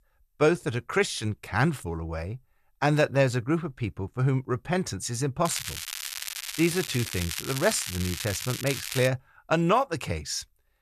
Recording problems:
crackling; loud; from 5.5 to 9 s; 6 dB below the speech

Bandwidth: 14 kHz